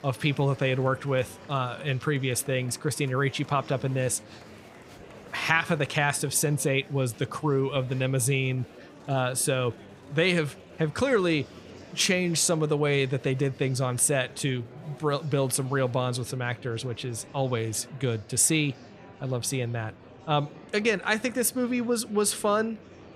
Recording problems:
murmuring crowd; faint; throughout; 20 dB below the speech

